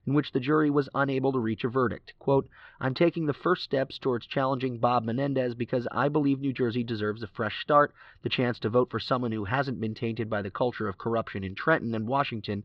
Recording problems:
muffled; slightly; fading above 3.5 kHz

